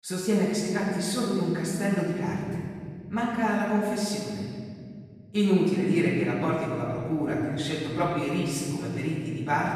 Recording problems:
room echo; strong; dies away in 2.5 s
off-mic speech; far

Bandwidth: 14.5 kHz